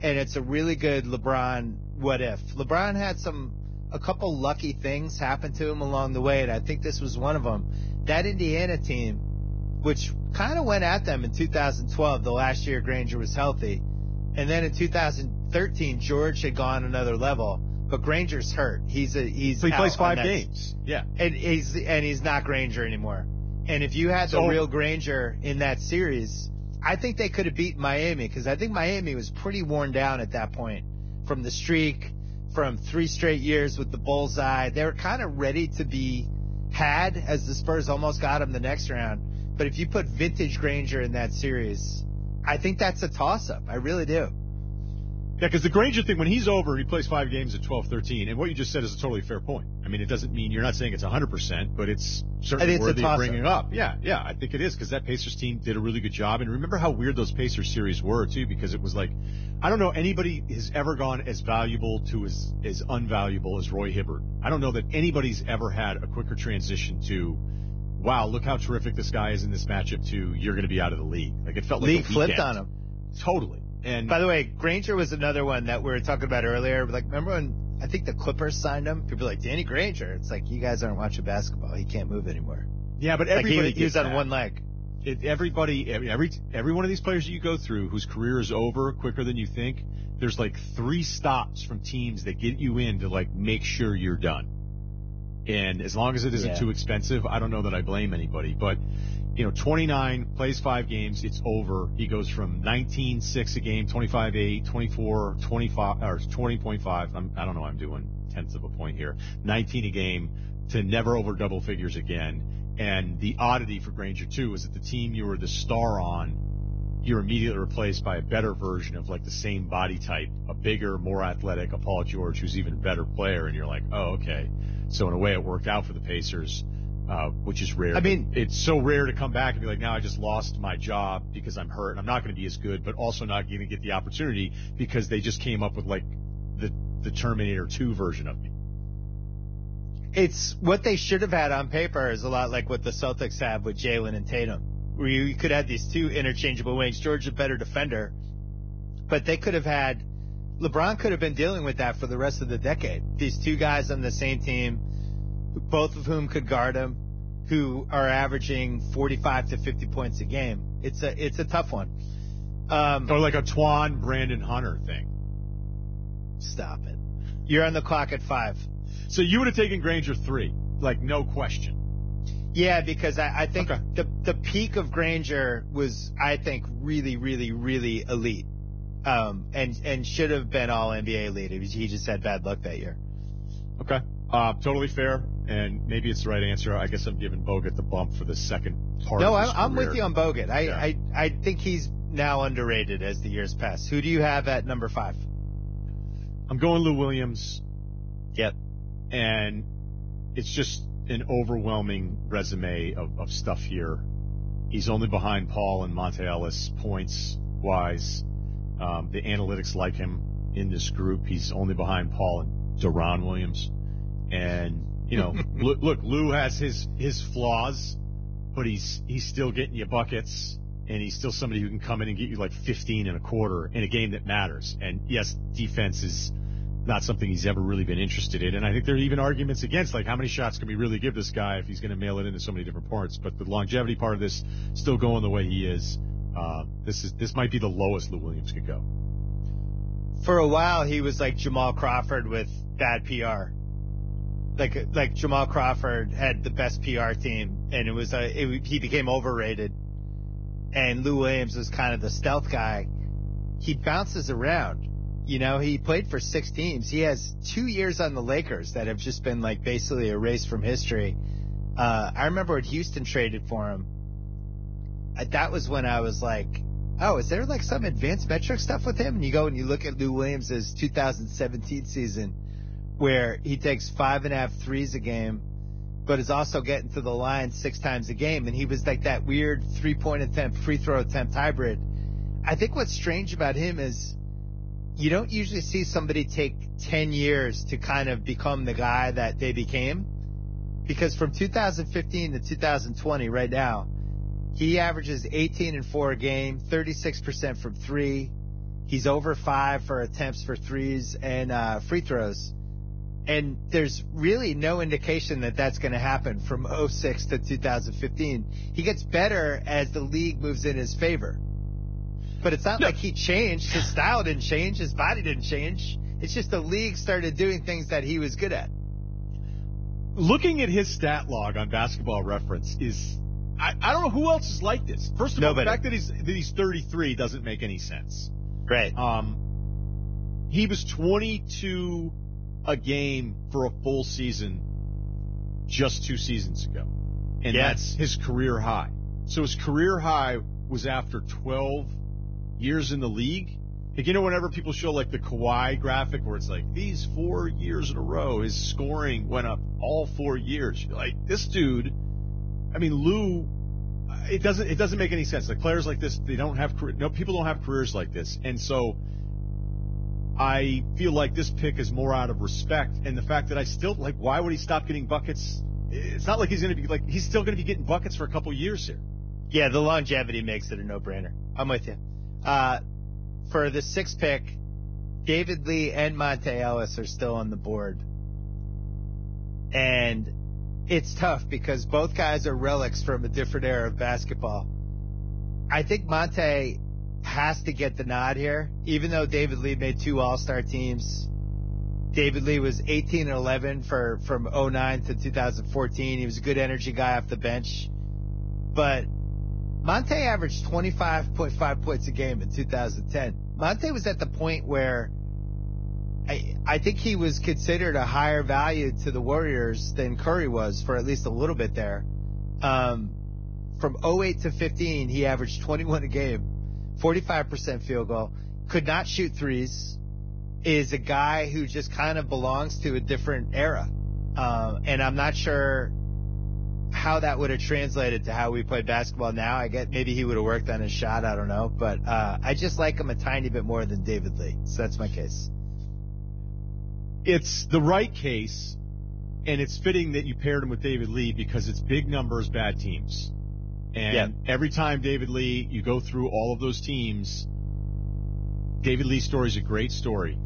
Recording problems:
garbled, watery; badly; nothing above 6.5 kHz
electrical hum; noticeable; throughout; 50 Hz, 20 dB below the speech

